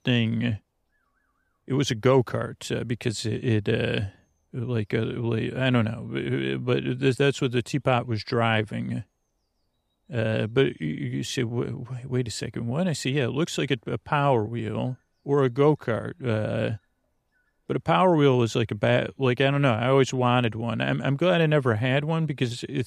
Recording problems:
none

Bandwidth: 15 kHz